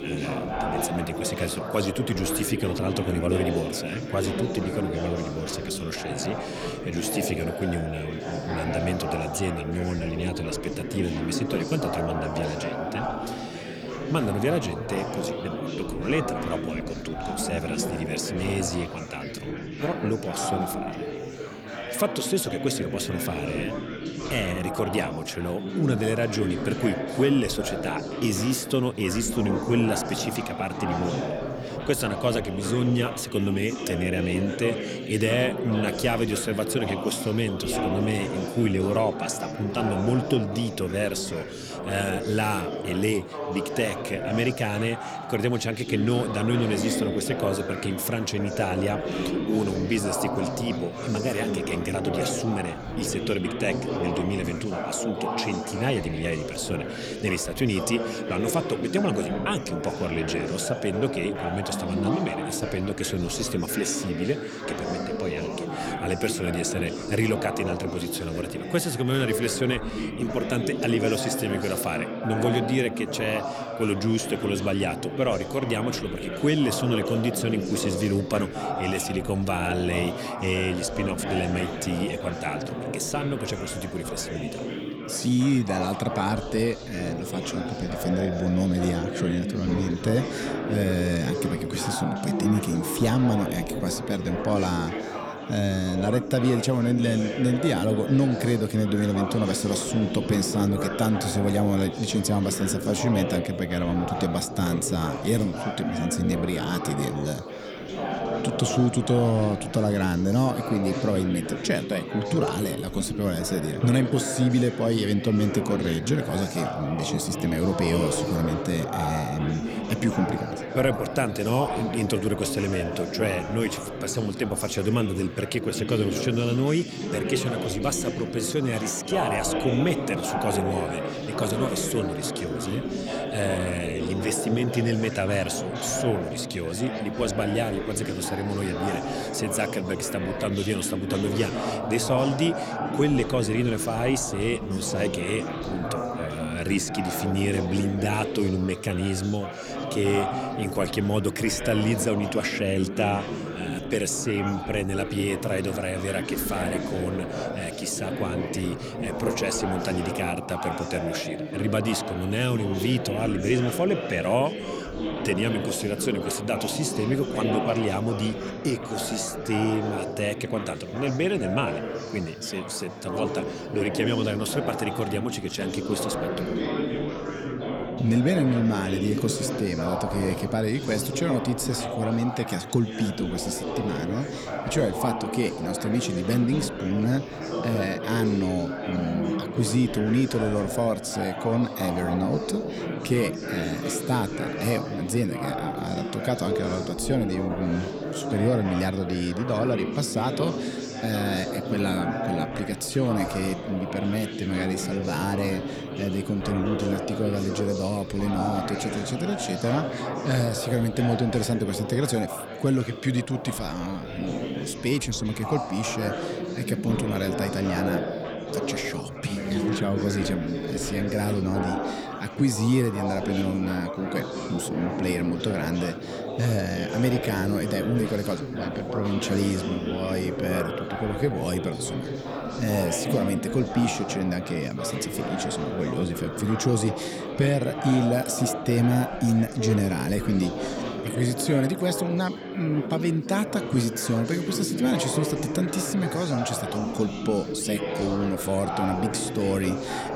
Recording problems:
chatter from many people; loud; throughout; 4 dB below the speech

